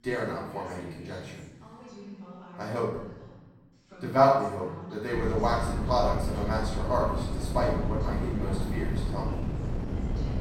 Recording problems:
off-mic speech; far
room echo; noticeable; dies away in 0.8 s
background chatter; noticeable; throughout; 2 voices, 15 dB below the speech
wind noise on the microphone; occasional gusts; from 5 s on; 10 dB below the speech

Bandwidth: 16 kHz